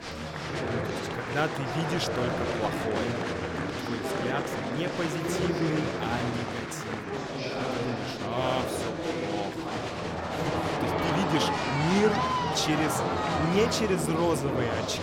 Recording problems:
murmuring crowd; very loud; throughout; 1 dB above the speech

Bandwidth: 17 kHz